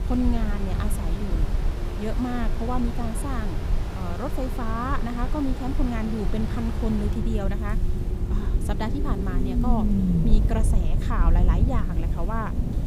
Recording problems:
rain or running water; loud; throughout; 7 dB below the speech
low rumble; loud; throughout; 7 dB below the speech
hiss; faint; throughout; 25 dB below the speech

